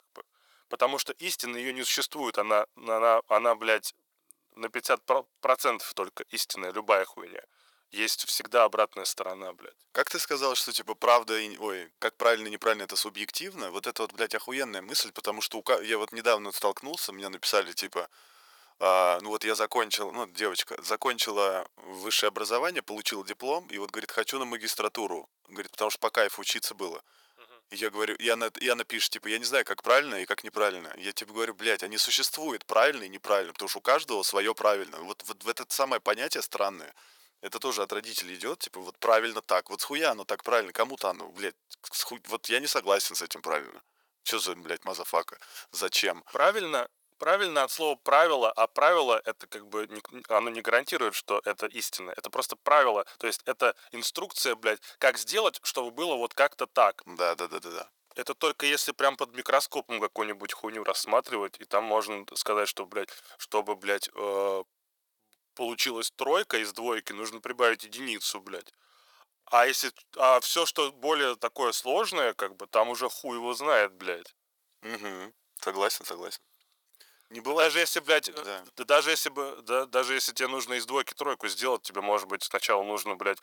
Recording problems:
thin; very; fading below 550 Hz

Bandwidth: 18.5 kHz